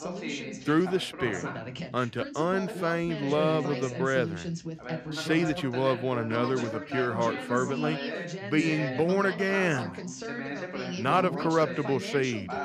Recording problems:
background chatter; loud; throughout; 2 voices, 7 dB below the speech

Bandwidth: 15 kHz